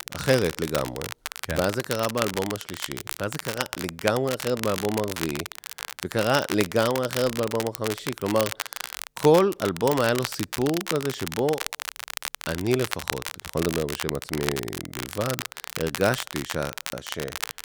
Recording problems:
crackle, like an old record; loud; 6 dB below the speech

